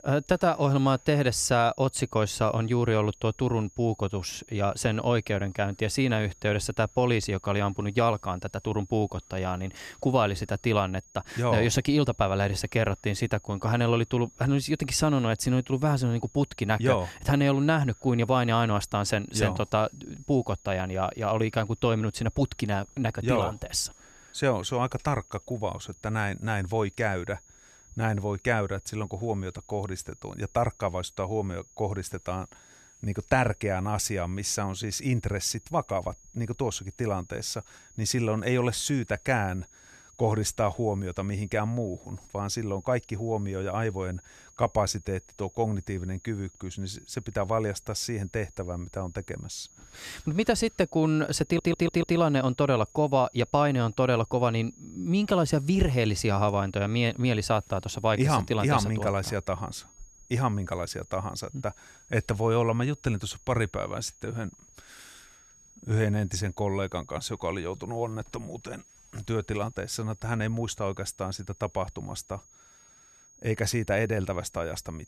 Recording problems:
high-pitched whine; faint; throughout; 6.5 kHz, 25 dB below the speech
audio stuttering; at 51 s

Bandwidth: 14 kHz